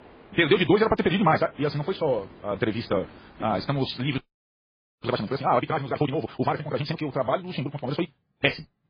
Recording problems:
garbled, watery; badly
wrong speed, natural pitch; too fast; 1.6 times normal speed
train or aircraft noise; faint; until 4 s; 25 dB below the speech
audio freezing; at 4 s for 1 s

